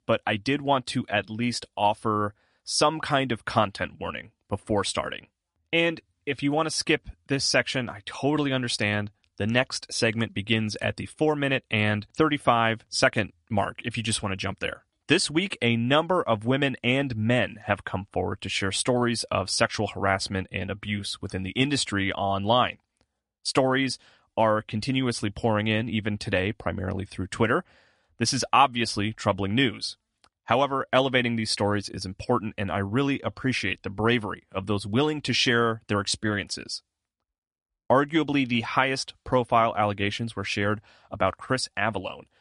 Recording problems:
garbled, watery; slightly; nothing above 10.5 kHz

